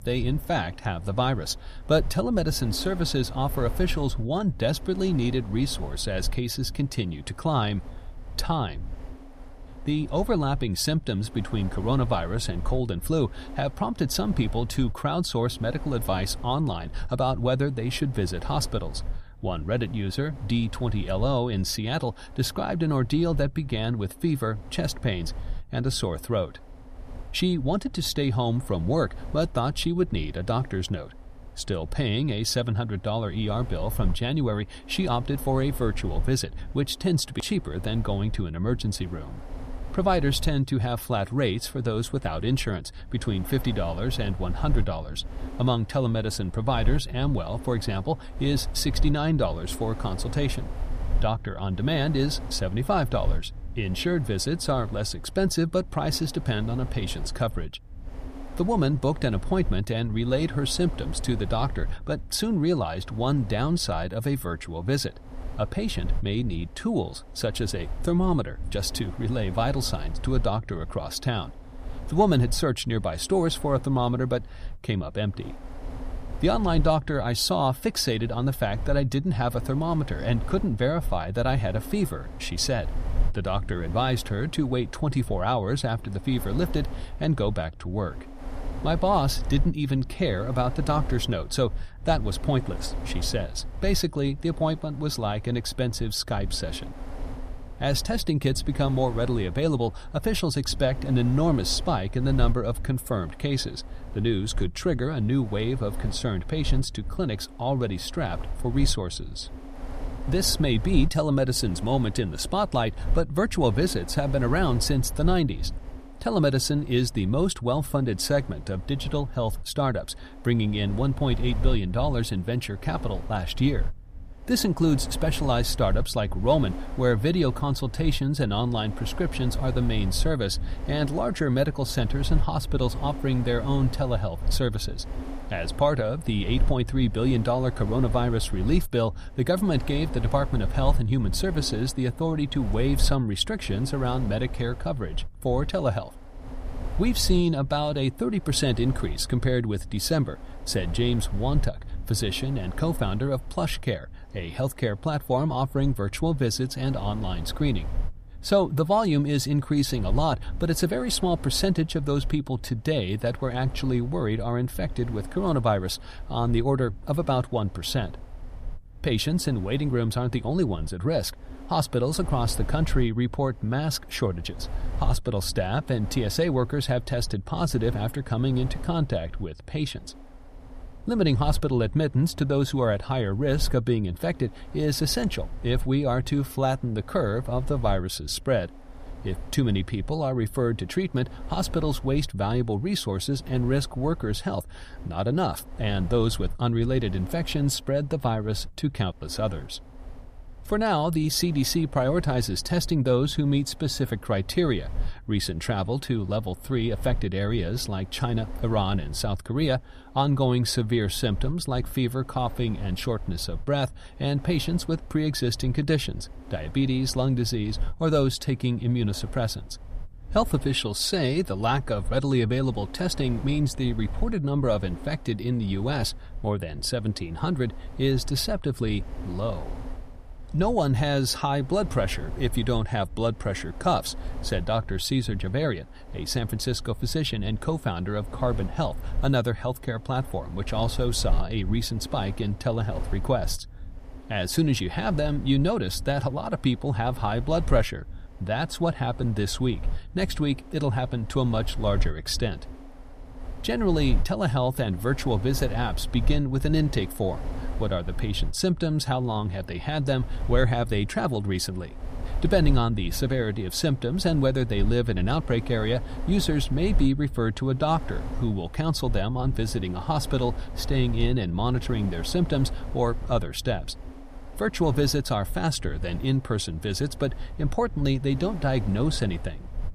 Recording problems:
wind noise on the microphone; occasional gusts; 20 dB below the speech

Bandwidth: 14.5 kHz